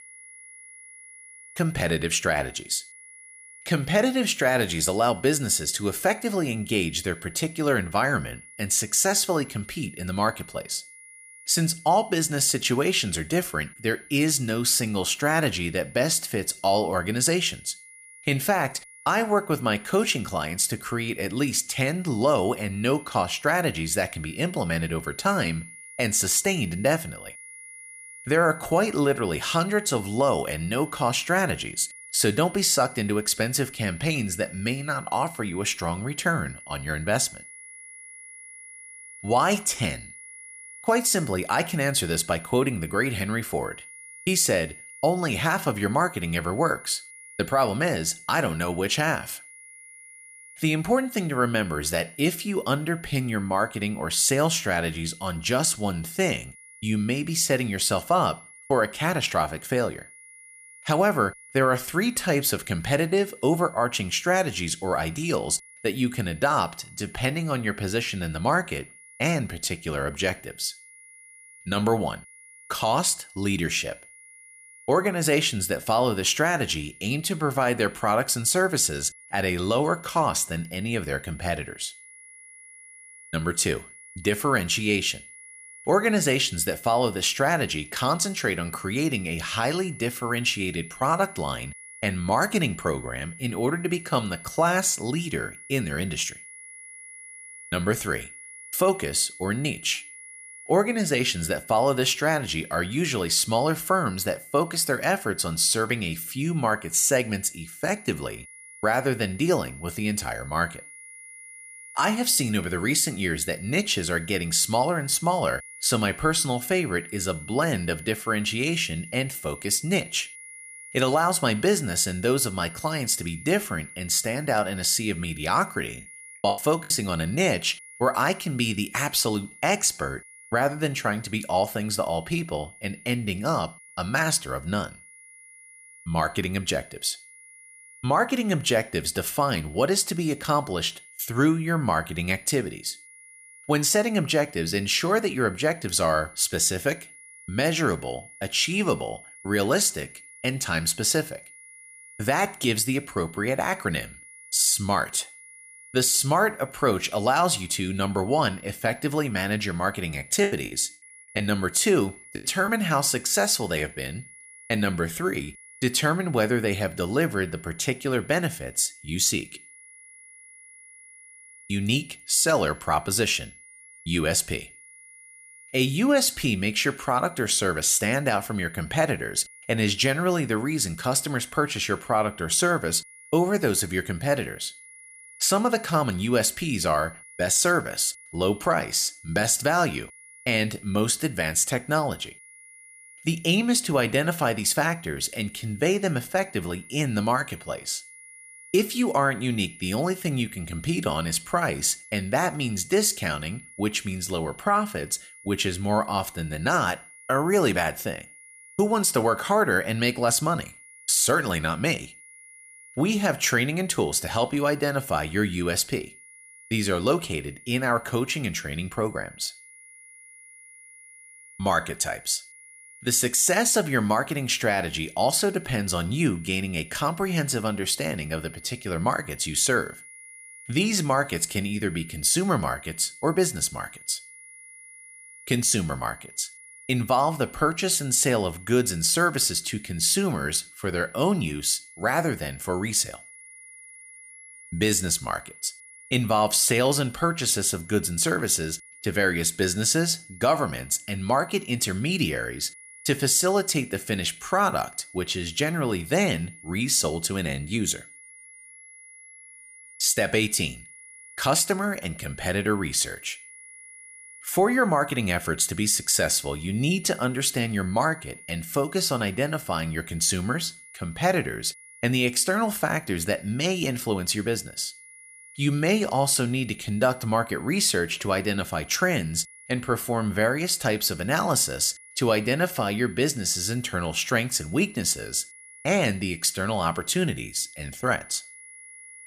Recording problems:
high-pitched whine; noticeable; throughout; 2 kHz, 20 dB below the speech
choppy; very; at 2:06 and from 2:40 to 2:43; 11% of the speech affected

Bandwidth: 14.5 kHz